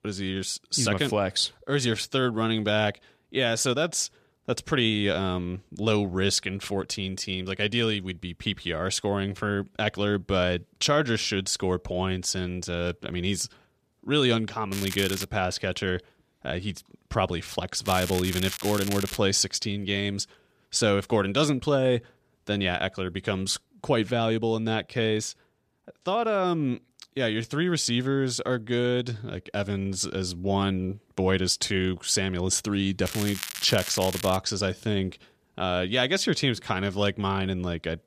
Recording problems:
crackling; loud; at 15 s, from 18 to 19 s and from 33 to 34 s; 8 dB below the speech

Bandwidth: 14.5 kHz